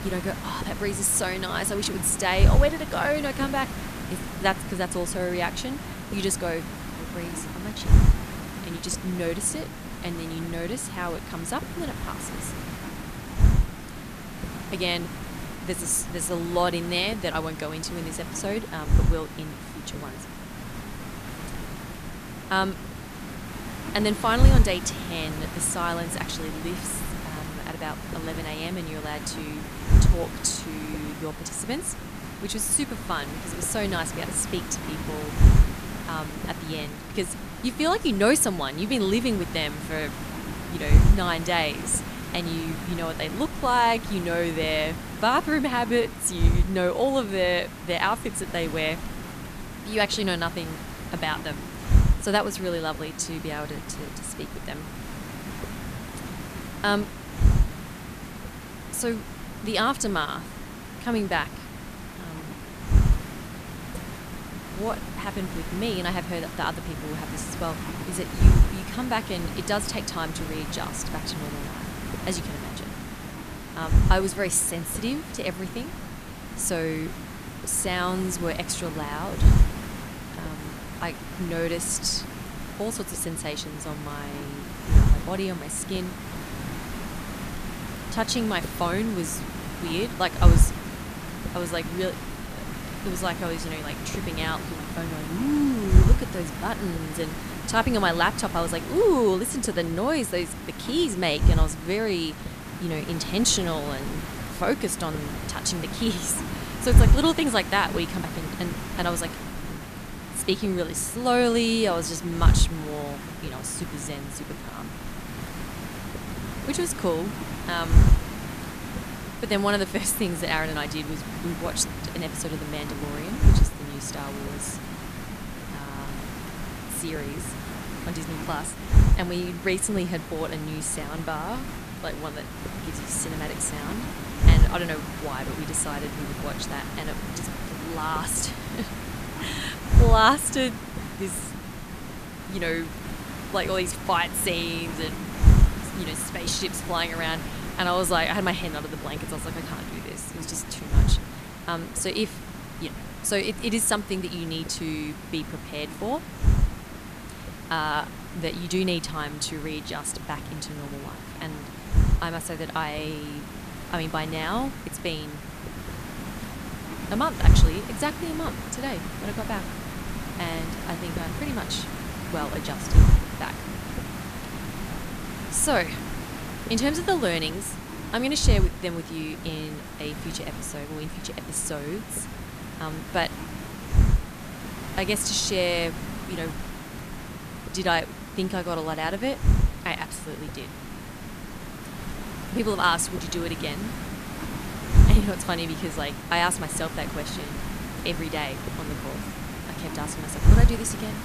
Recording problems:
hiss; loud; throughout; 2 dB below the speech

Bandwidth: 14.5 kHz